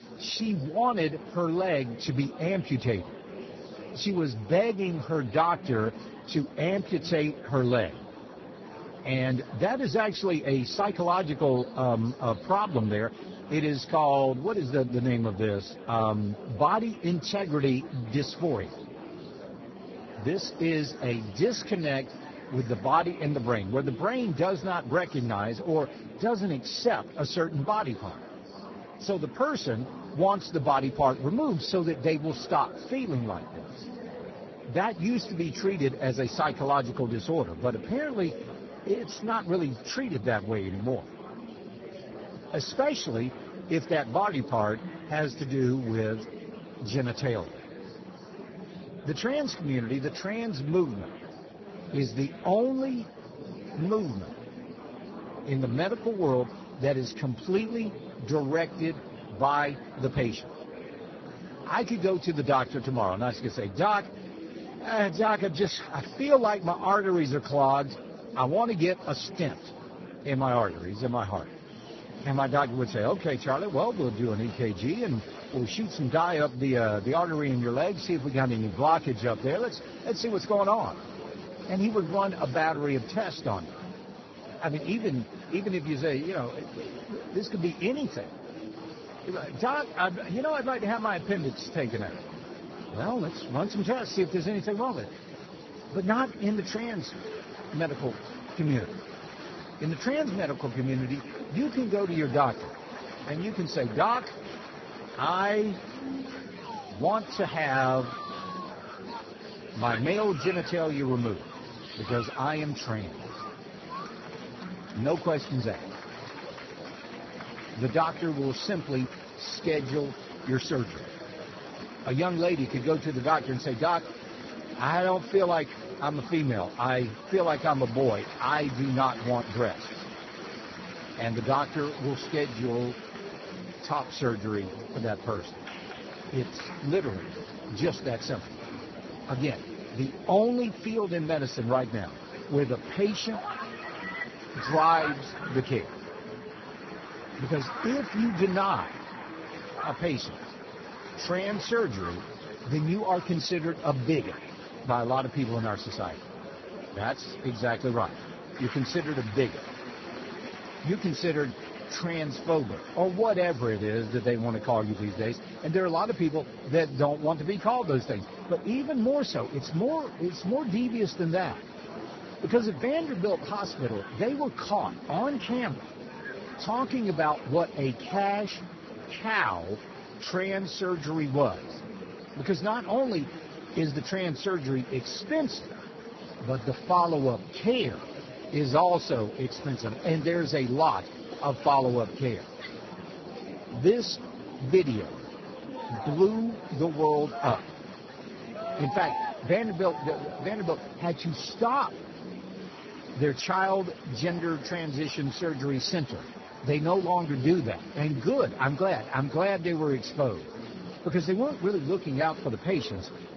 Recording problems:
garbled, watery; badly
high frequencies cut off; noticeable; nothing above 6 kHz
murmuring crowd; noticeable; throughout; 10 dB below the speech

